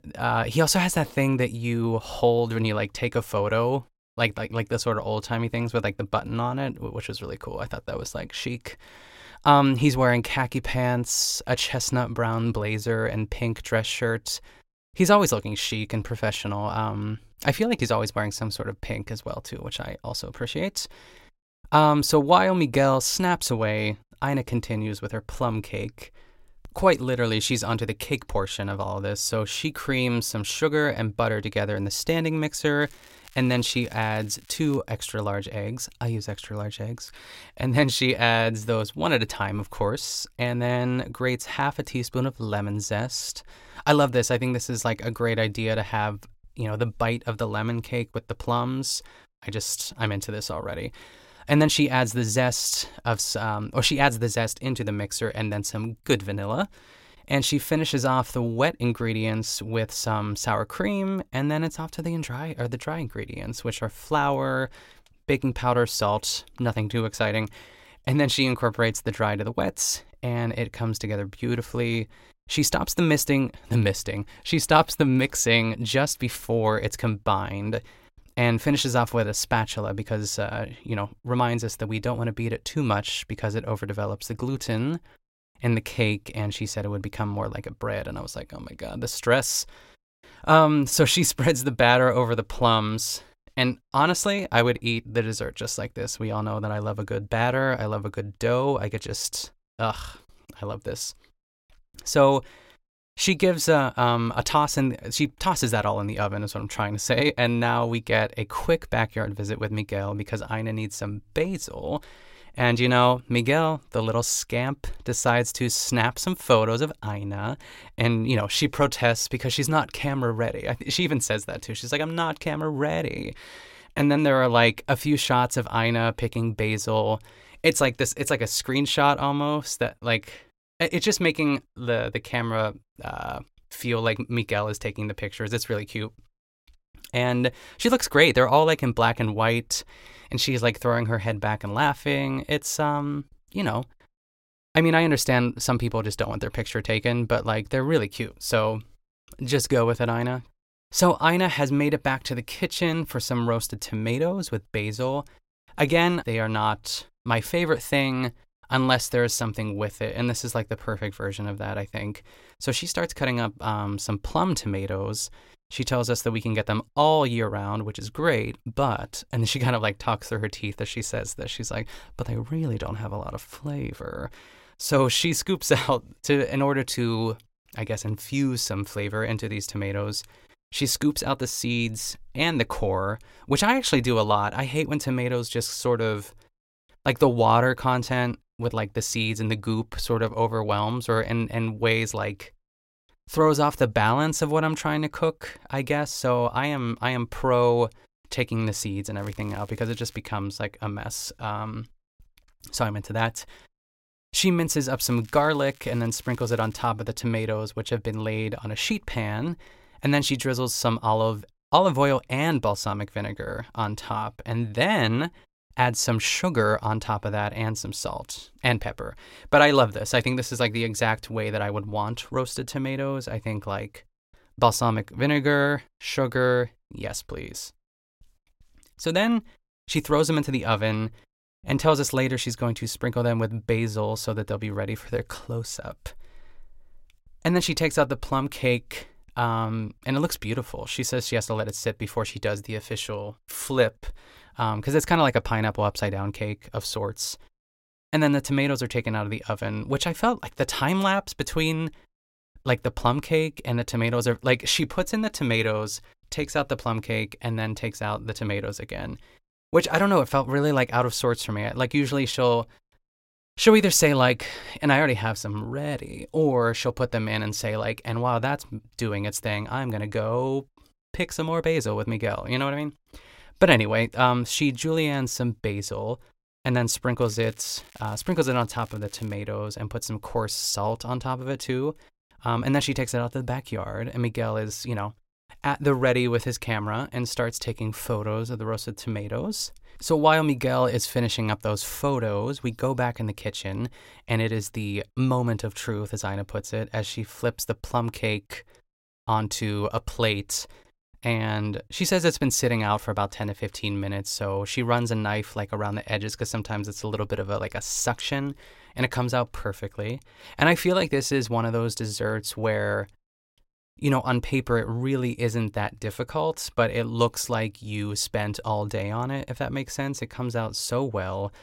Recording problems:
crackling; faint; 4 times, first at 33 s; 25 dB below the speech

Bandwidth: 16 kHz